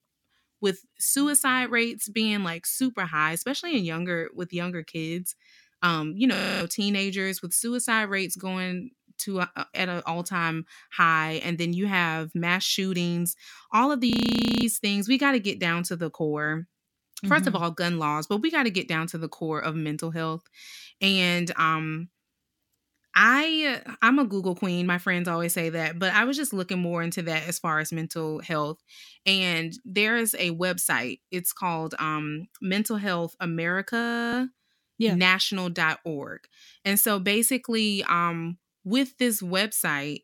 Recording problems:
audio freezing; at 6.5 s, at 14 s for 0.5 s and at 34 s

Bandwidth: 17 kHz